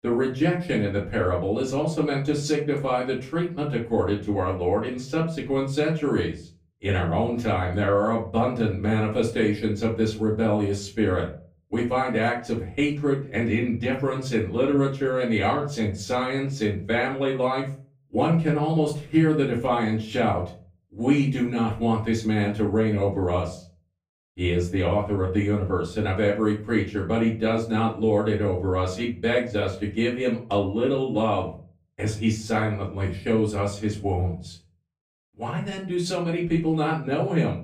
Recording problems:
off-mic speech; far
room echo; slight; dies away in 0.3 s

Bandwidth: 15 kHz